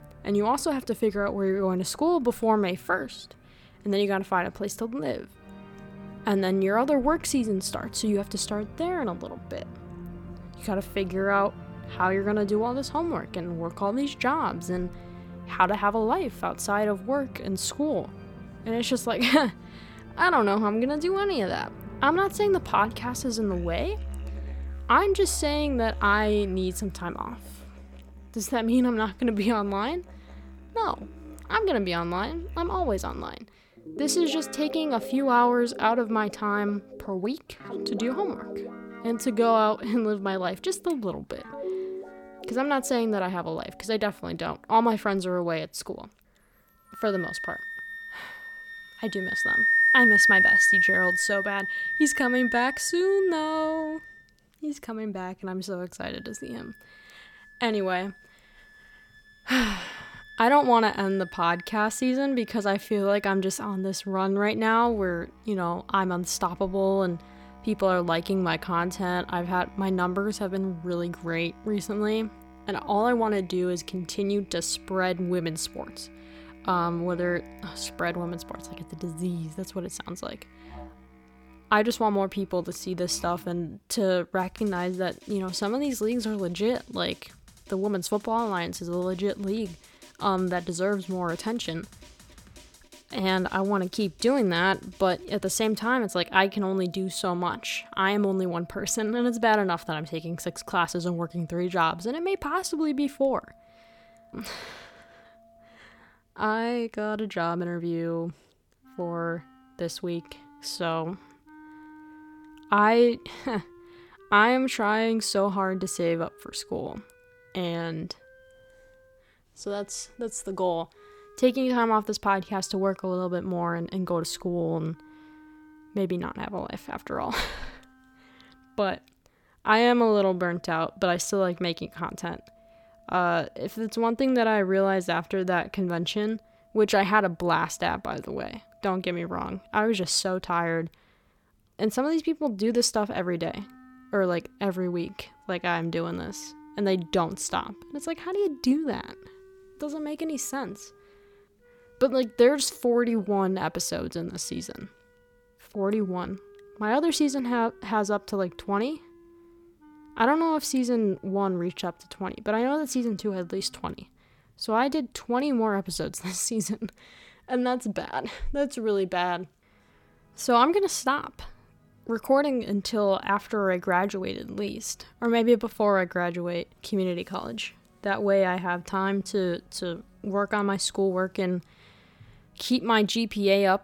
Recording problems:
background music; loud; throughout; 4 dB below the speech

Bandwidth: 18 kHz